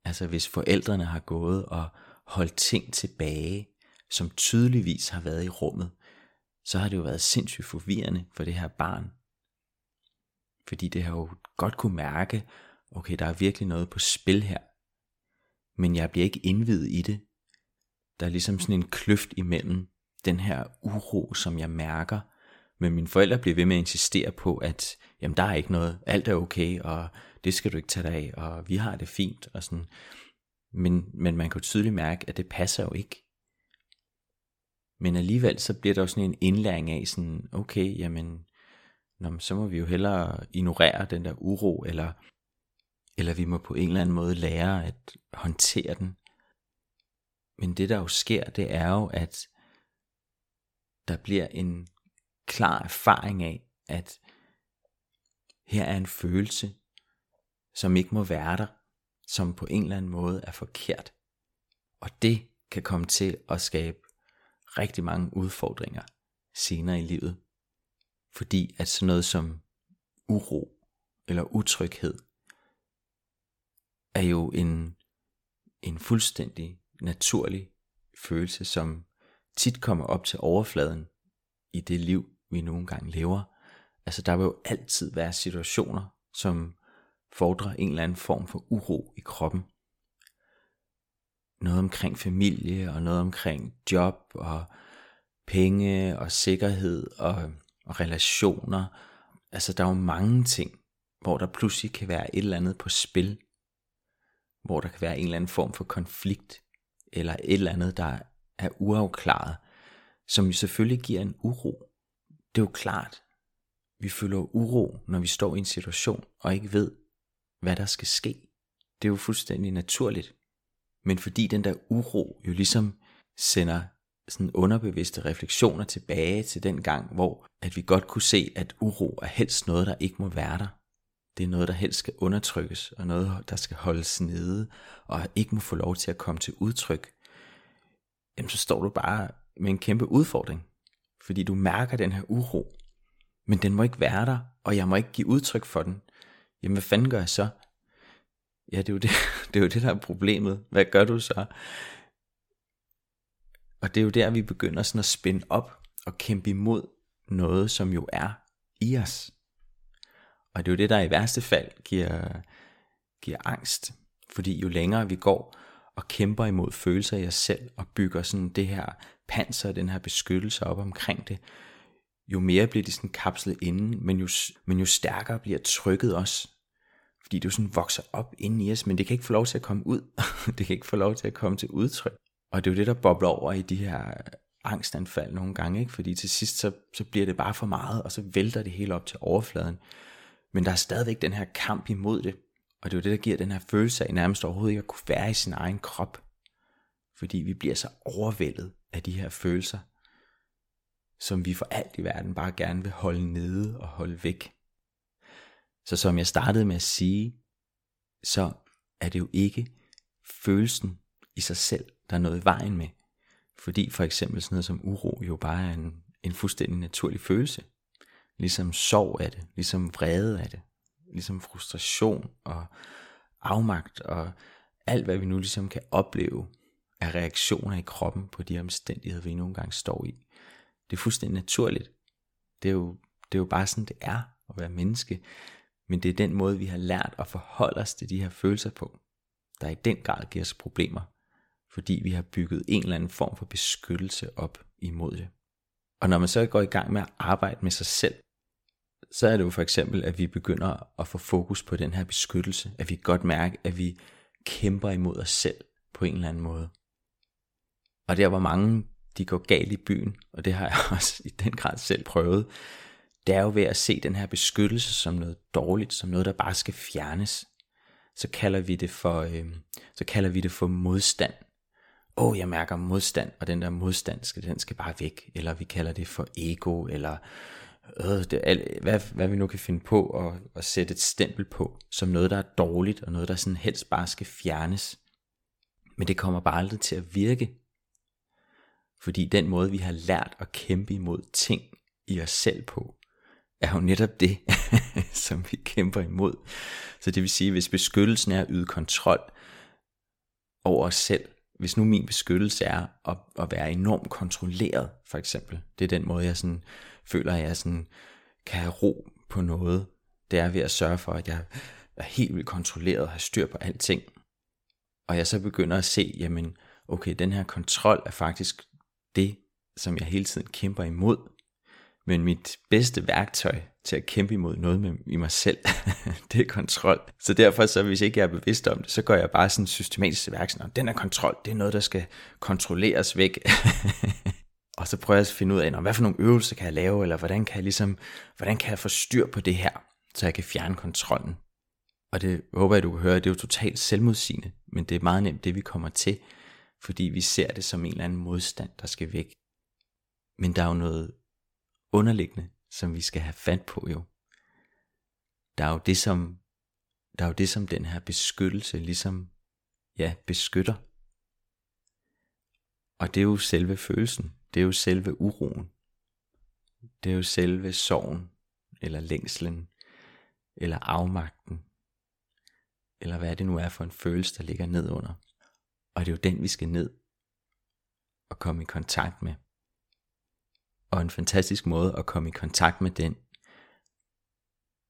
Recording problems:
none

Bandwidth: 17 kHz